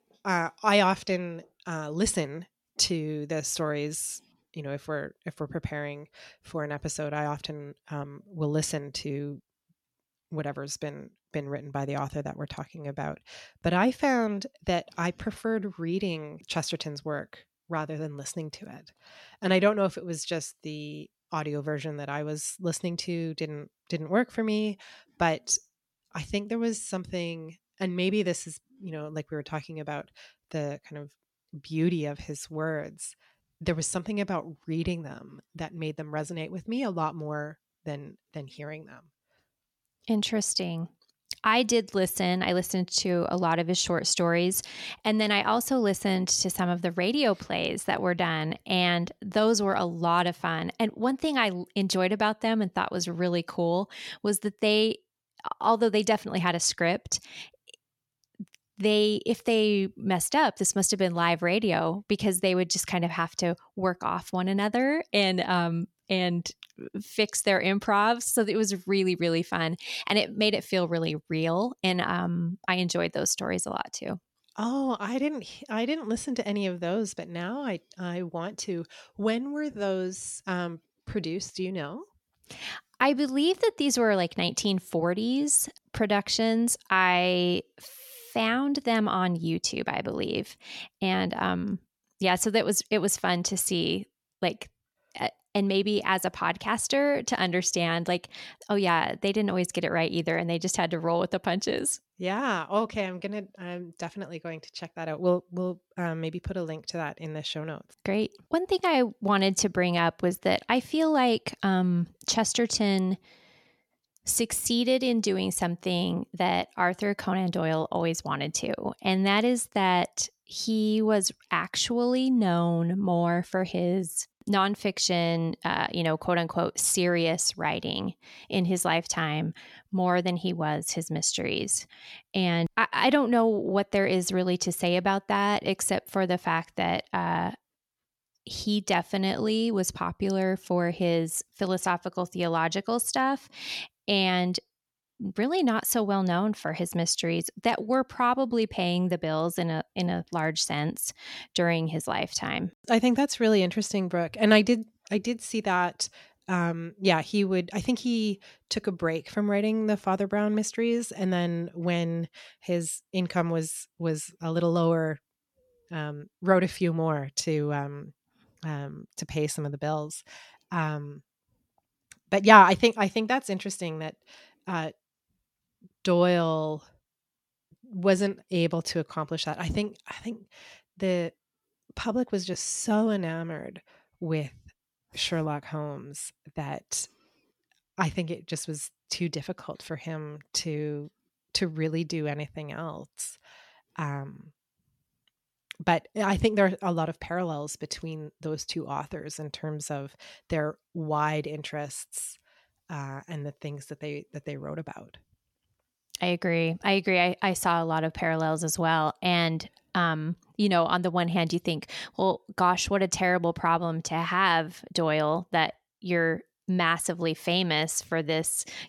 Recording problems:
none

